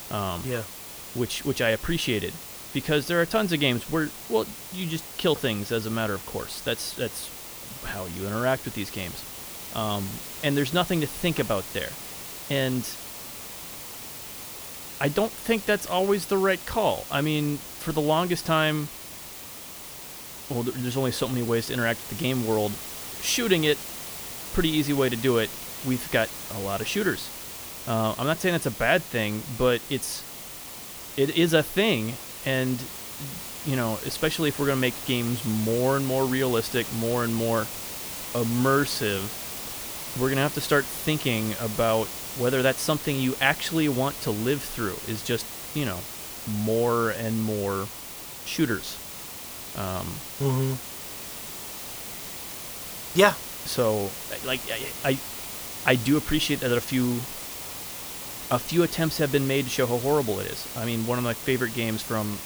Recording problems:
hiss; loud; throughout; 9 dB below the speech

